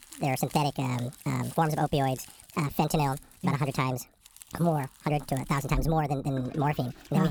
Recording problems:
wrong speed and pitch; too fast and too high; 1.6 times normal speed
household noises; noticeable; throughout; 20 dB below the speech
uneven, jittery; slightly; from 0.5 to 6.5 s
abrupt cut into speech; at the end

